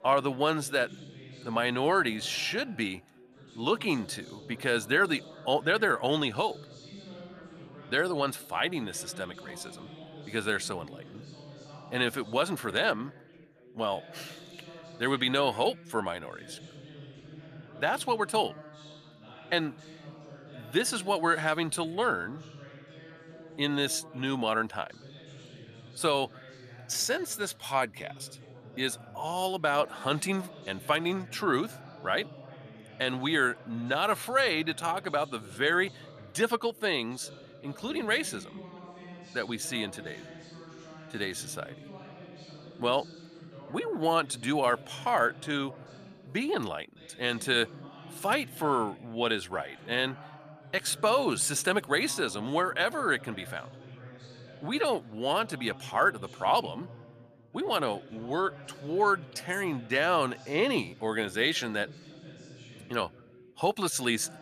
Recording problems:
background chatter; noticeable; throughout; 2 voices, 20 dB below the speech

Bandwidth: 14.5 kHz